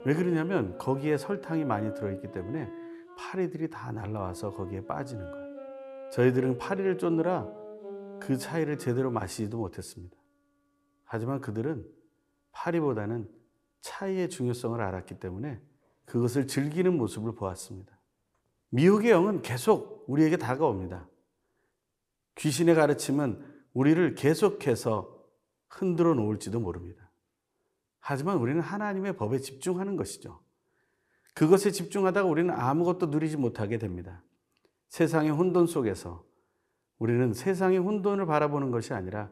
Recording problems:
background music; noticeable; throughout; 15 dB below the speech

